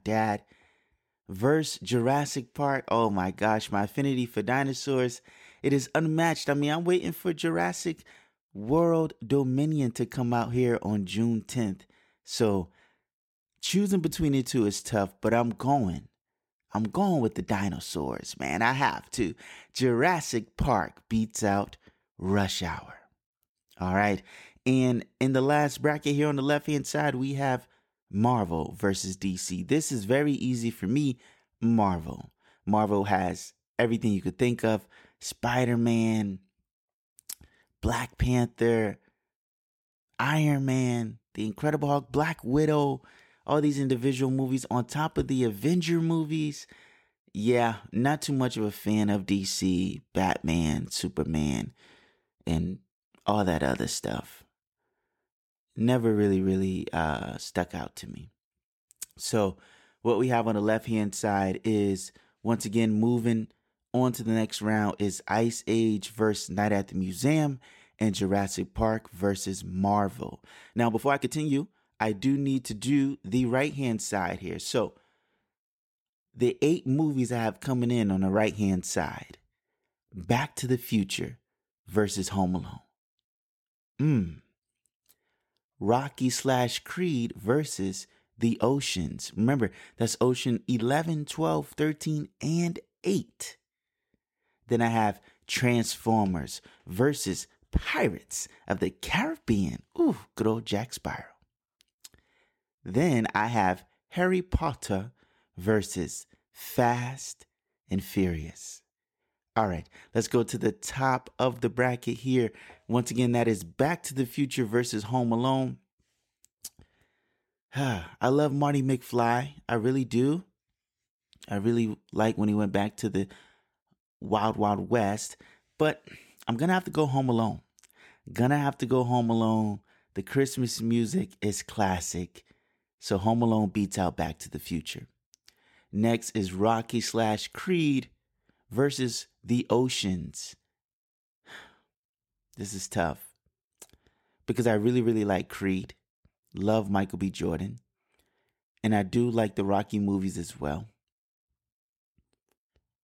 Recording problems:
uneven, jittery; strongly; from 14 s to 1:12

